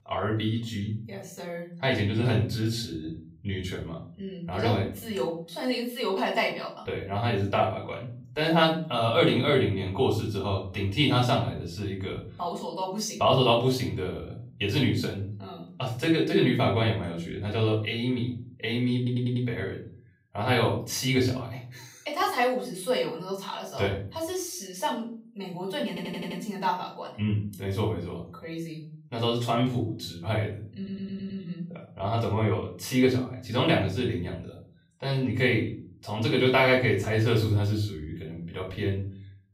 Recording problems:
off-mic speech; far
room echo; slight; dies away in 0.5 s
audio stuttering; at 19 s, at 26 s and at 31 s

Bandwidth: 15.5 kHz